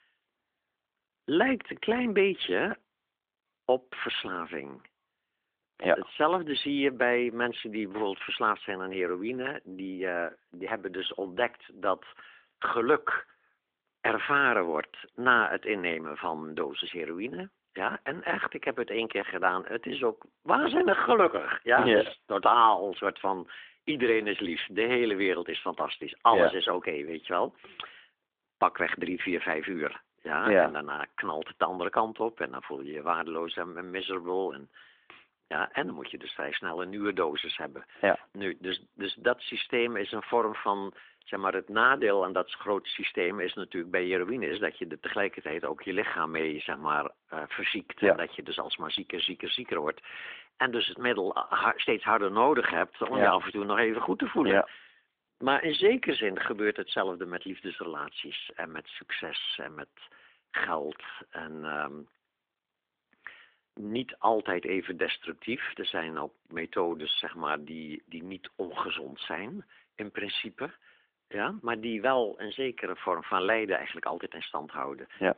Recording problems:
phone-call audio; nothing above 3.5 kHz

